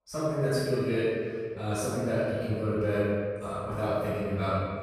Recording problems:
room echo; strong; dies away in 1.8 s
off-mic speech; far

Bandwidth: 14.5 kHz